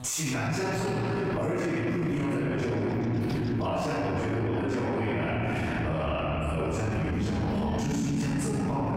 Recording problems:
room echo; strong; dies away in 3 s
off-mic speech; far
squashed, flat; somewhat
electrical hum; faint; until 5.5 s; 50 Hz, 25 dB below the speech

